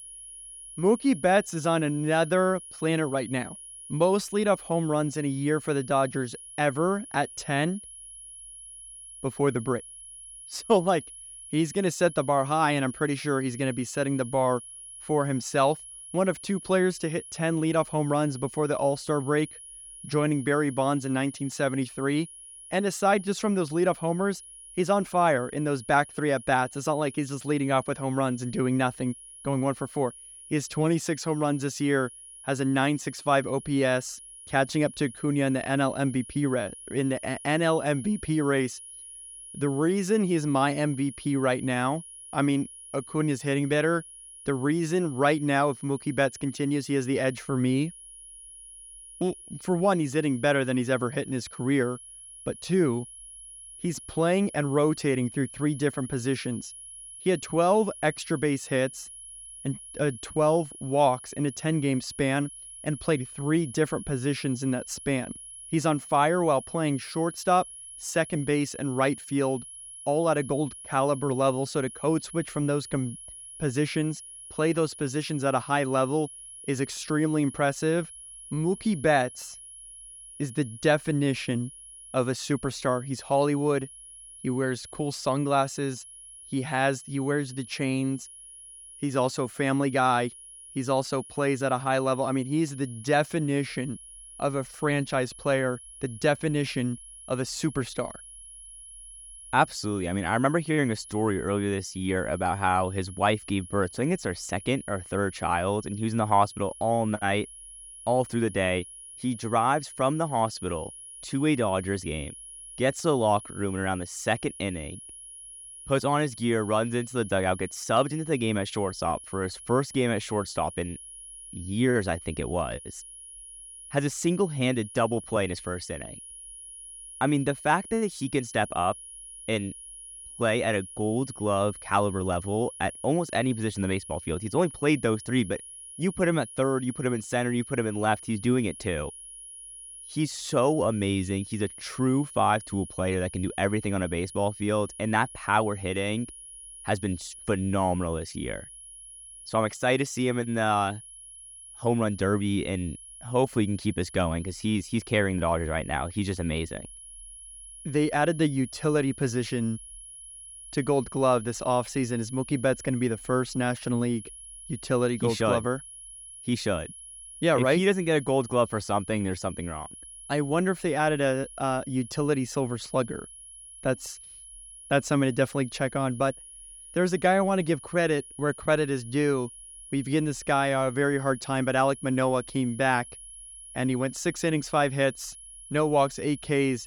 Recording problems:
high-pitched whine; noticeable; throughout; 10.5 kHz, 15 dB below the speech

